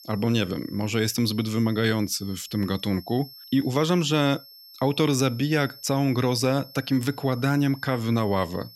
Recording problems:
high-pitched whine; noticeable; throughout; 5.5 kHz, 20 dB below the speech

